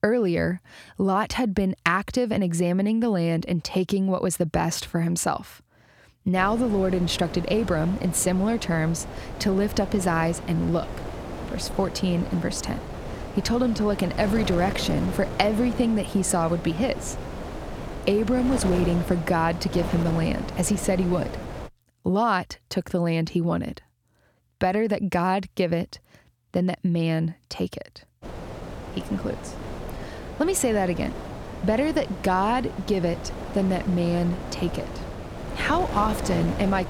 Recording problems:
wind noise on the microphone; heavy; from 6.5 to 22 s and from 28 s on; 10 dB below the speech

